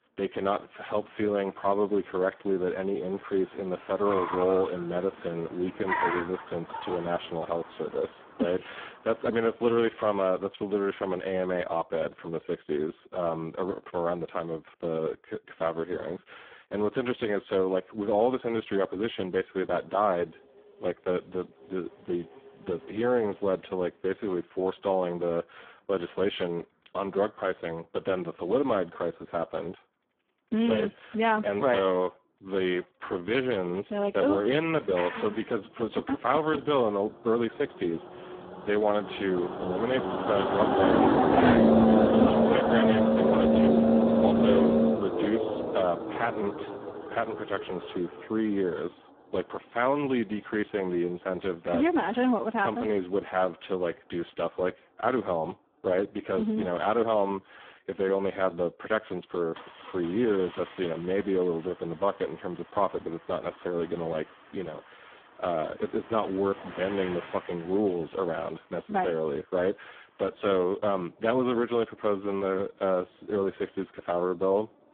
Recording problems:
phone-call audio; poor line
traffic noise; very loud; throughout; 4 dB above the speech

